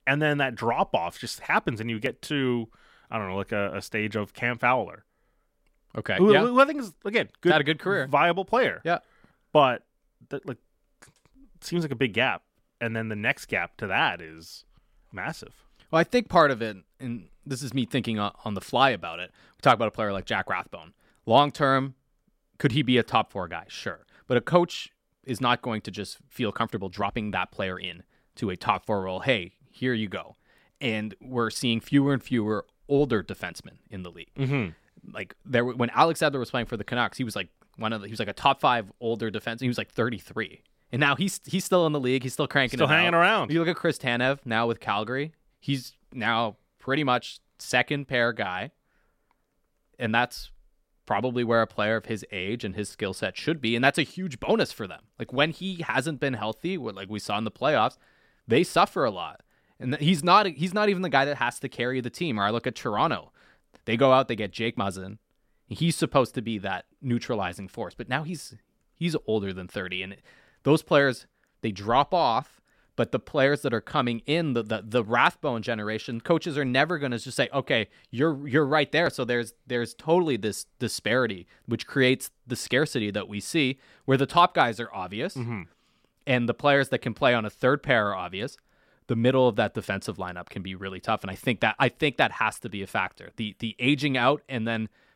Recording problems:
uneven, jittery; strongly; from 27 to 47 s

